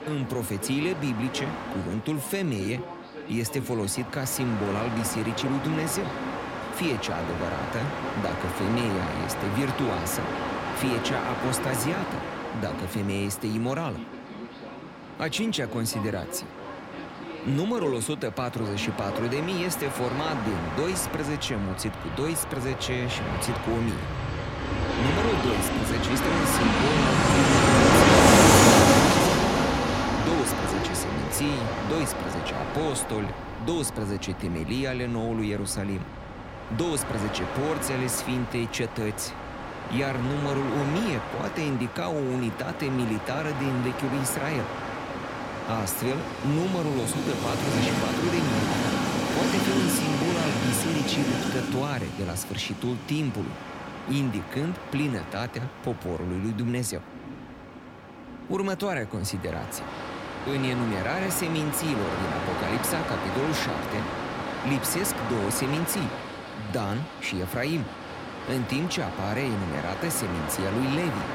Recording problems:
train or aircraft noise; very loud; throughout; 2 dB above the speech

